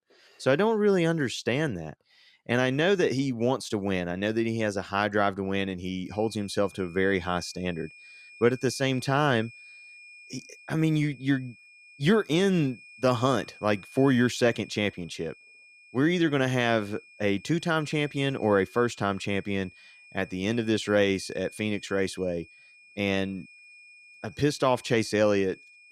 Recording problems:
high-pitched whine; faint; from 6 s on; 2.5 kHz, 20 dB below the speech

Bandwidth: 14.5 kHz